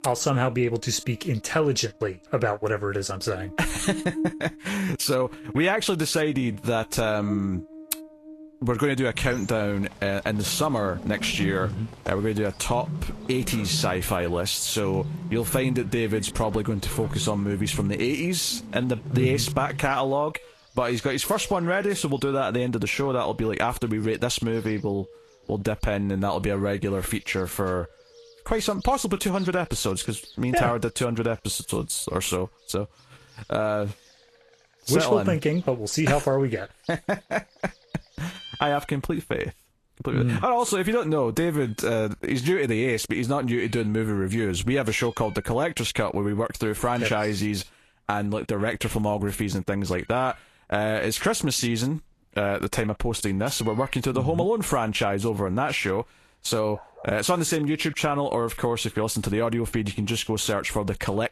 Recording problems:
garbled, watery; slightly; nothing above 12.5 kHz
animal sounds; noticeable; throughout; 15 dB below the speech

